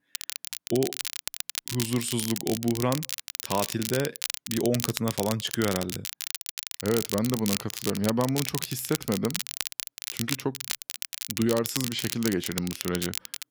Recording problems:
crackle, like an old record; loud; 4 dB below the speech

